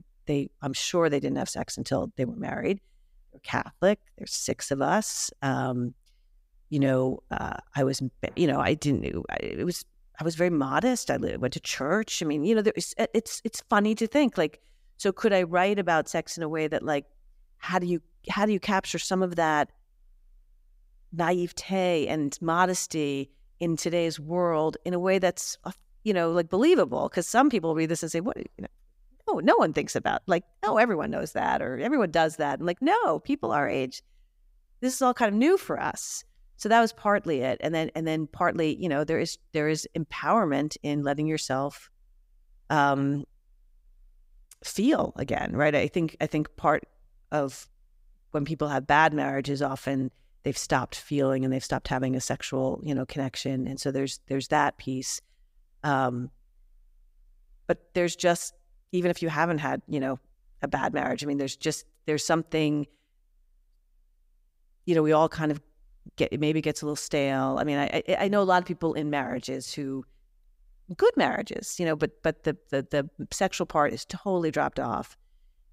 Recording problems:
none

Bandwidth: 15.5 kHz